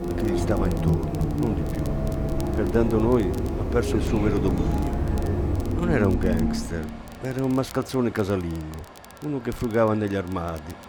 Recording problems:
traffic noise; very loud; throughout; as loud as the speech
hiss; faint; until 6 s; 25 dB below the speech
crackle, like an old record; faint; 25 dB below the speech

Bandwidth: 18.5 kHz